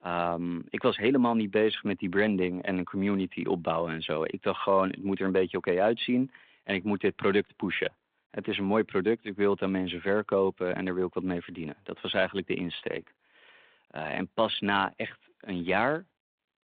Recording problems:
phone-call audio; nothing above 3.5 kHz

